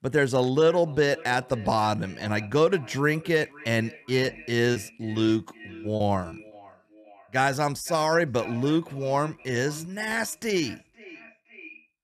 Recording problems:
echo of what is said; faint; throughout; 520 ms later, 20 dB below the speech
choppy; occasionally; from 4.5 to 6.5 s; 4% of the speech affected

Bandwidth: 14 kHz